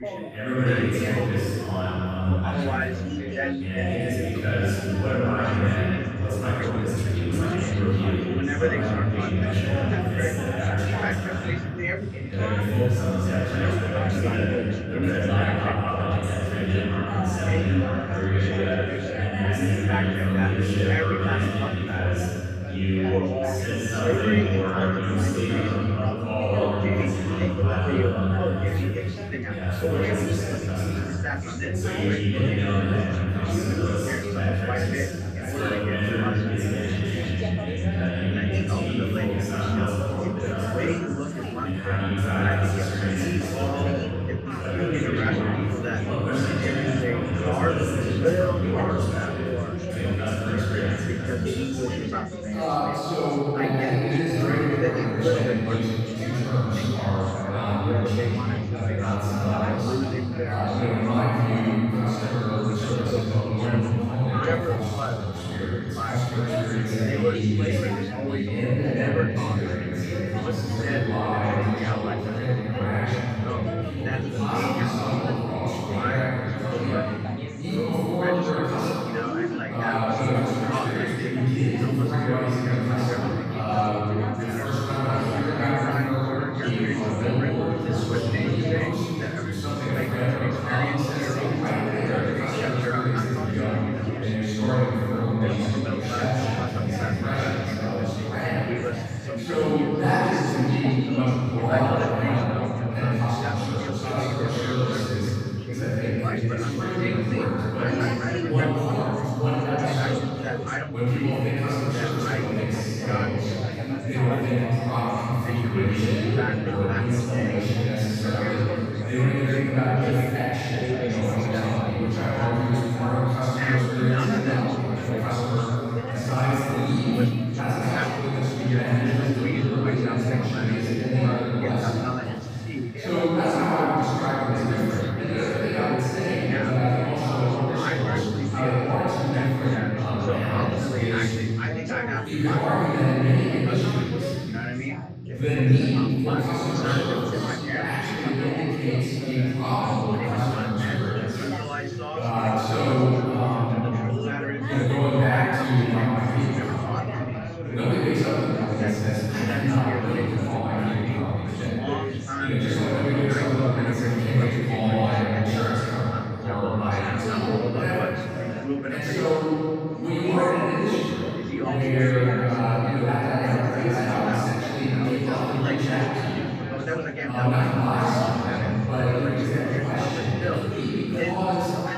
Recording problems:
room echo; strong; dies away in 3 s
off-mic speech; far
background chatter; loud; throughout; 3 voices, 6 dB below the speech
uneven, jittery; strongly; from 6.5 s to 2:26

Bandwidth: 15 kHz